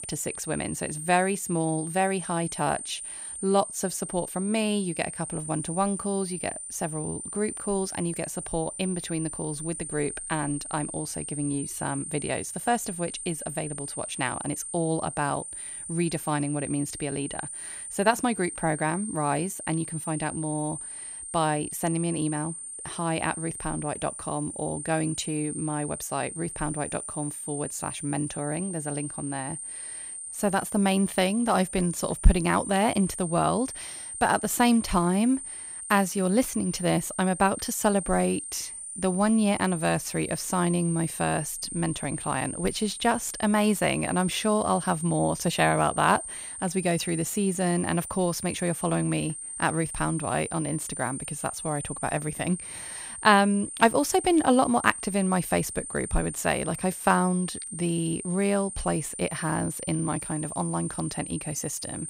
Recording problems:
high-pitched whine; loud; throughout; 9 kHz, 7 dB below the speech

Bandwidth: 15.5 kHz